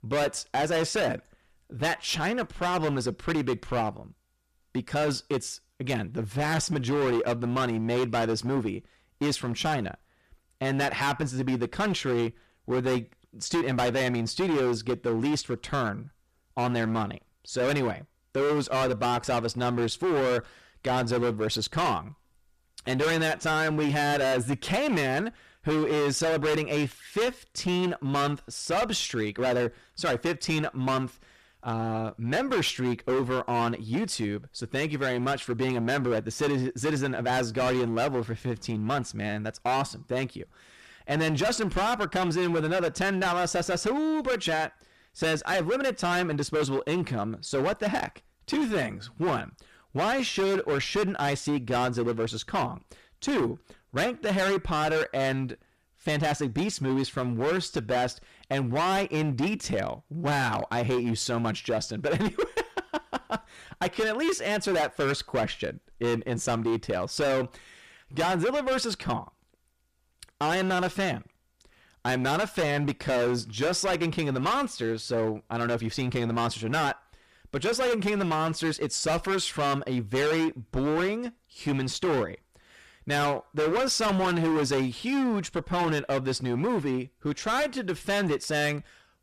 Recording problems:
distortion; heavy; 18% of the sound clipped

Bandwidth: 14.5 kHz